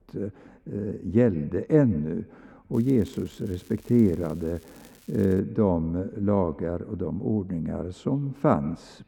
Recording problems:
muffled; very; fading above 1.5 kHz
echo of what is said; faint; throughout; 150 ms later, 25 dB below the speech
crackling; faint; from 2.5 to 5.5 s; 25 dB below the speech

